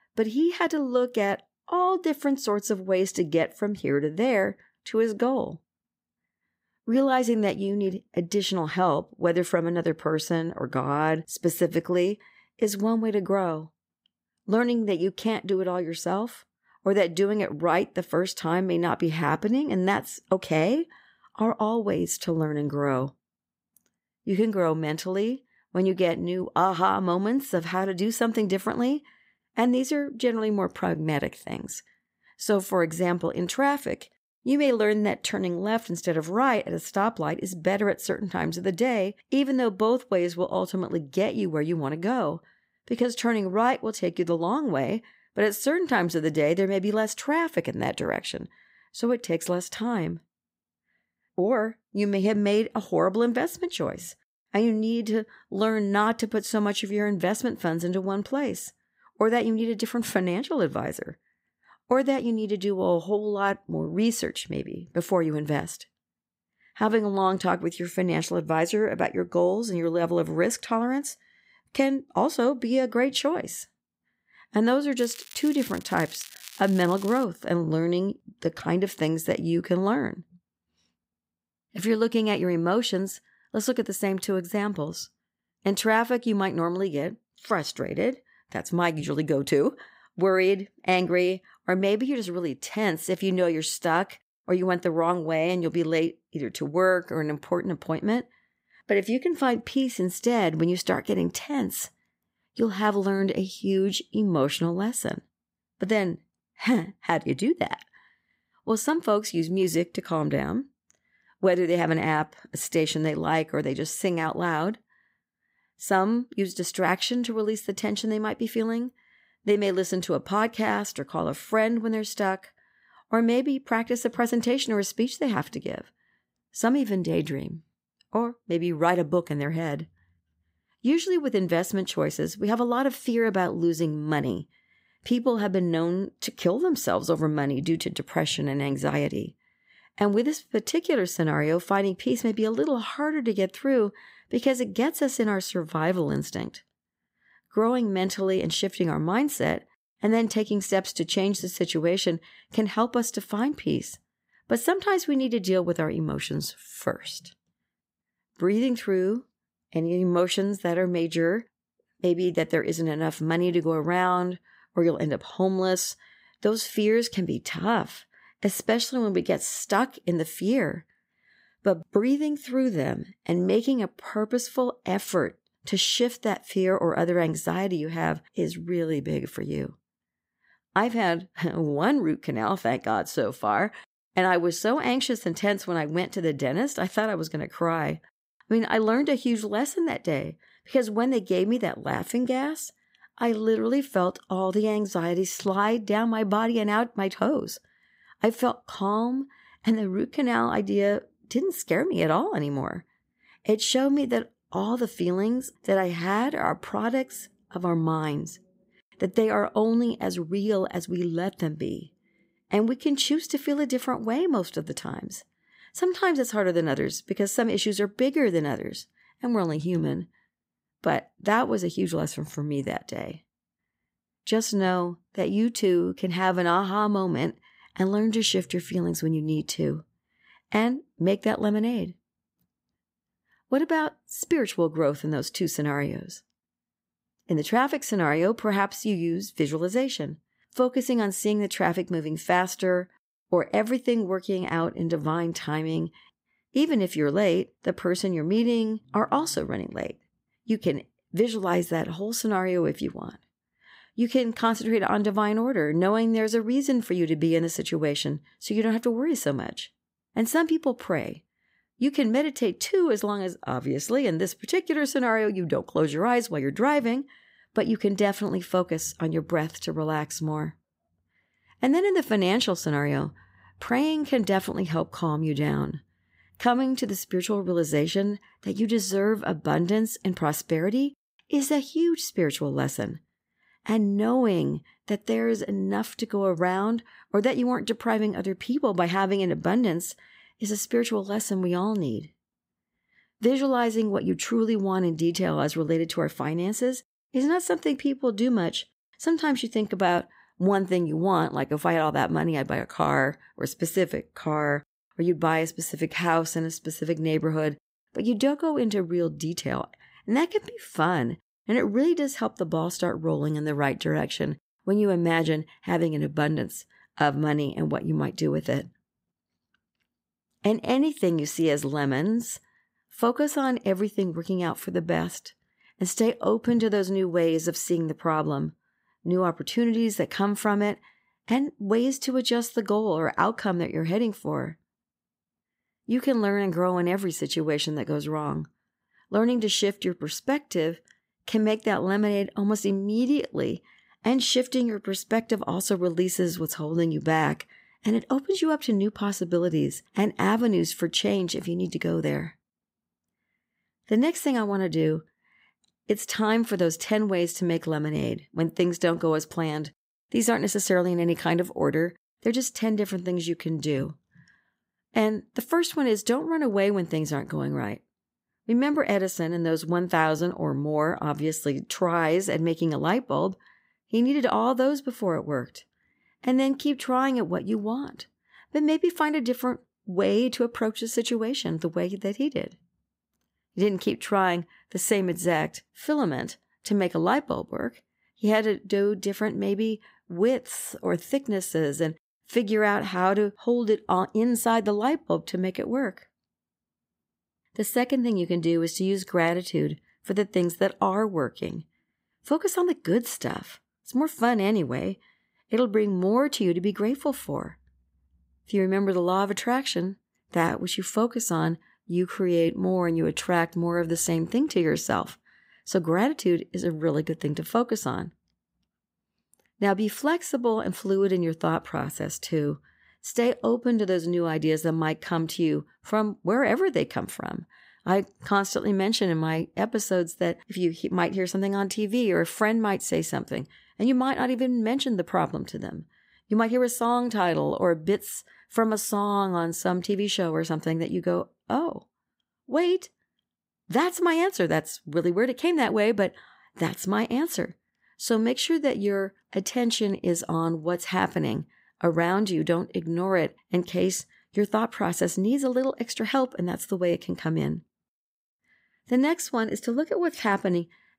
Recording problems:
crackling; noticeable; from 1:15 to 1:17; 15 dB below the speech

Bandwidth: 15.5 kHz